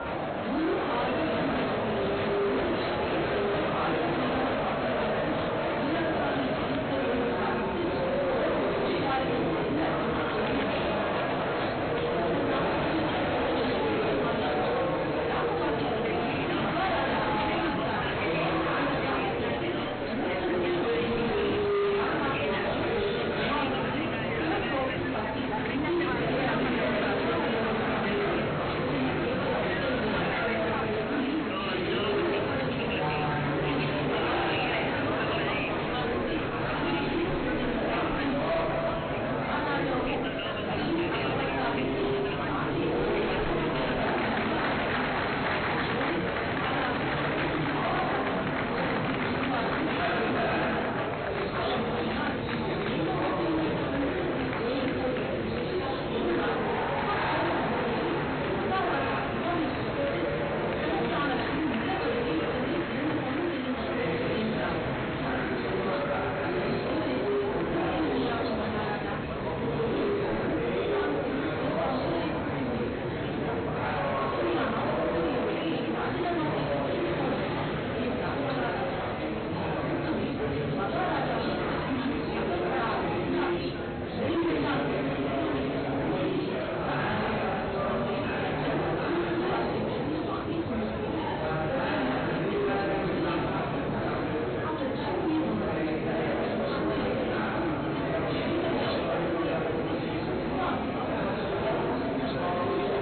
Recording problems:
off-mic speech; far
high frequencies cut off; severe; nothing above 4 kHz
room echo; noticeable; dies away in 0.5 s
distortion; slight; 20% of the sound clipped
murmuring crowd; very loud; throughout; 4 dB above the speech

